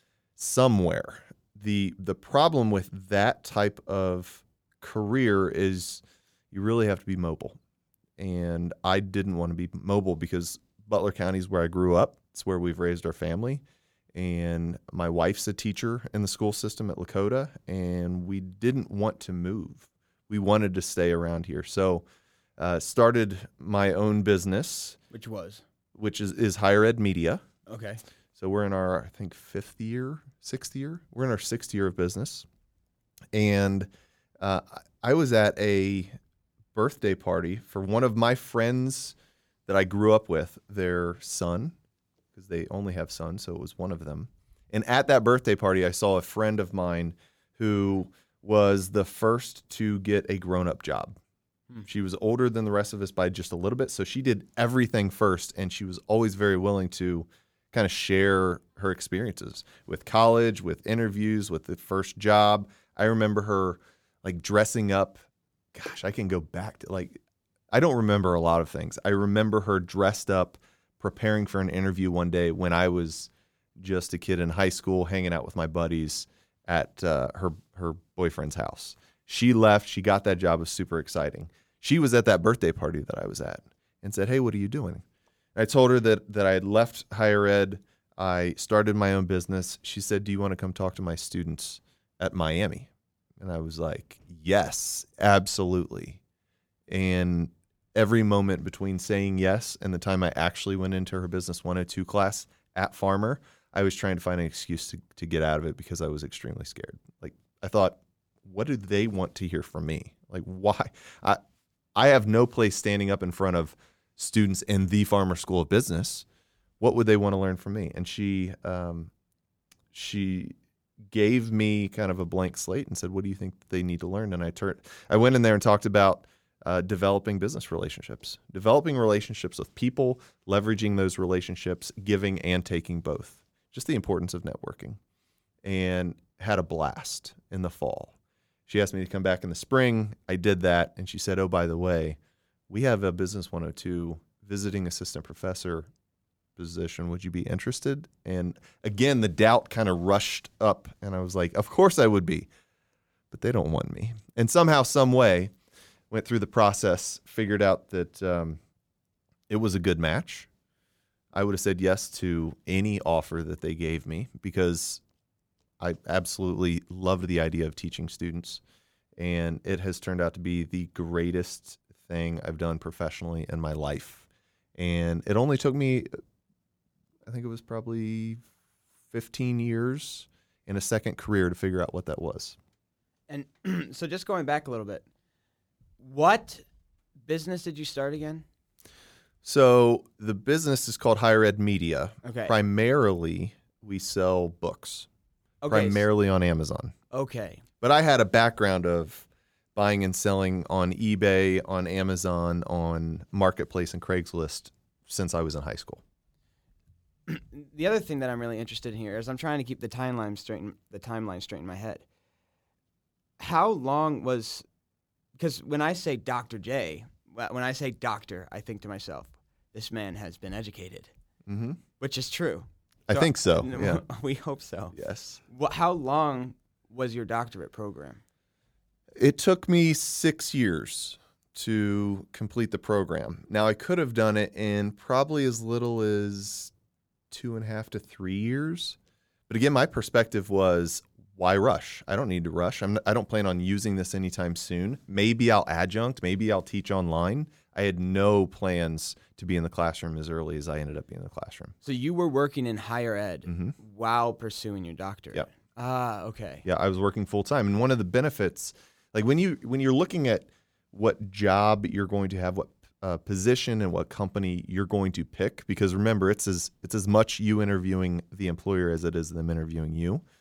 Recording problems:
none

